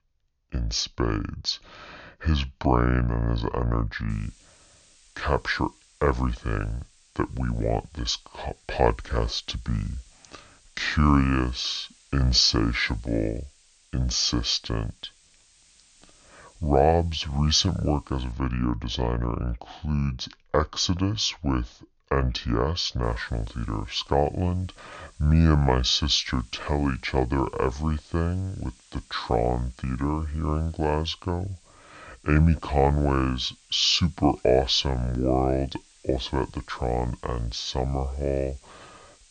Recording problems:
wrong speed and pitch; too slow and too low; 0.7 times normal speed
high frequencies cut off; noticeable; nothing above 7 kHz
hiss; faint; from 4 to 18 s and from 23 s on; 30 dB below the speech

